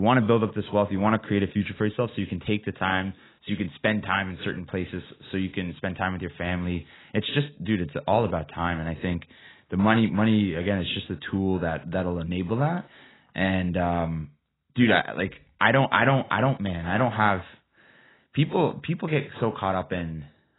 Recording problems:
garbled, watery; badly; nothing above 4 kHz
abrupt cut into speech; at the start

